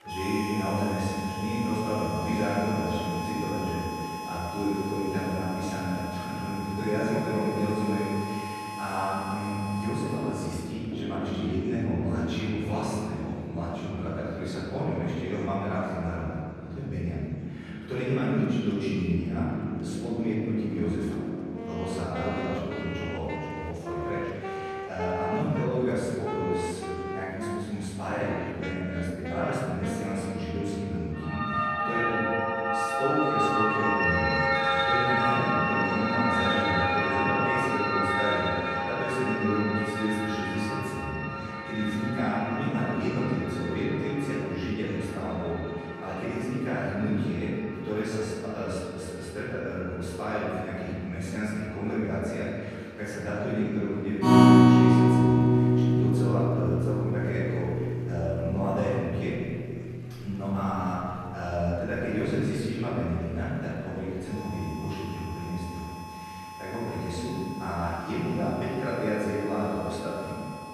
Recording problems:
room echo; strong; dies away in 2.1 s
off-mic speech; far
background music; very loud; throughout; 2 dB above the speech
murmuring crowd; faint; throughout; 25 dB below the speech

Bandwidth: 13.5 kHz